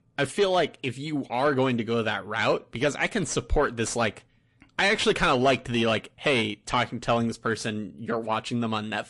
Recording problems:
distortion; slight; 10 dB below the speech
garbled, watery; slightly

